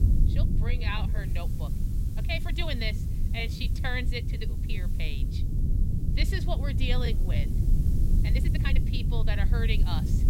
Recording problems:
low rumble; loud; throughout; 8 dB below the speech
hiss; noticeable; throughout; 20 dB below the speech
uneven, jittery; strongly; from 0.5 to 9 s

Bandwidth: 16 kHz